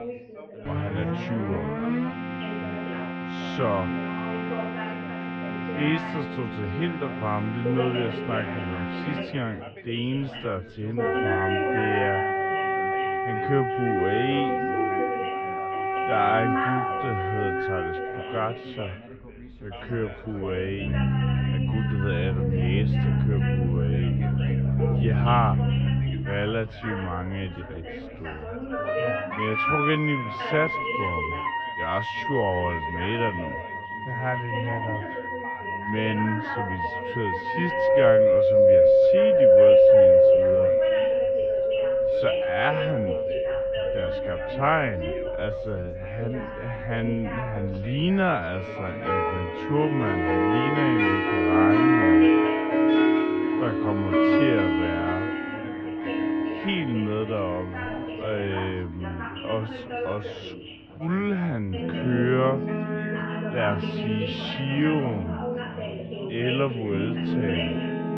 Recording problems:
muffled; very; fading above 2.5 kHz
wrong speed, natural pitch; too slow; 0.5 times normal speed
background music; very loud; throughout; 5 dB above the speech
background chatter; loud; throughout; 4 voices, 7 dB below the speech

